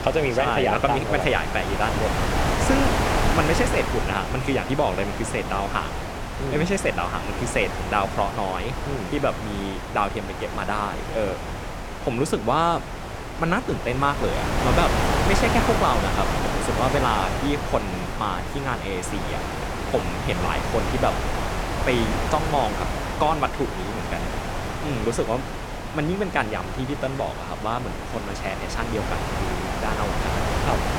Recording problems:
wind noise on the microphone; heavy; 3 dB below the speech

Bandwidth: 17 kHz